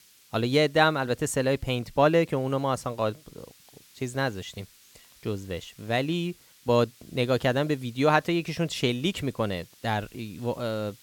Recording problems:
hiss; faint; throughout; 25 dB below the speech

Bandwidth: 17 kHz